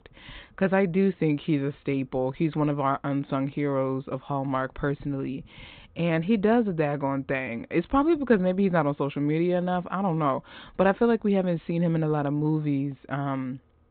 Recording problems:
high frequencies cut off; severe; nothing above 4 kHz

